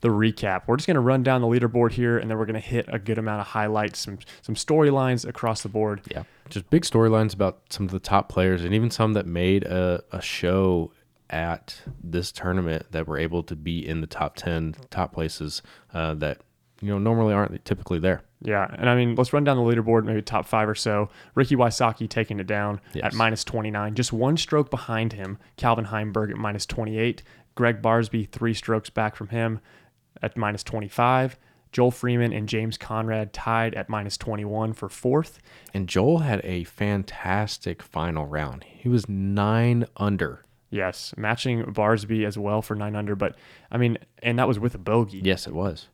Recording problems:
none

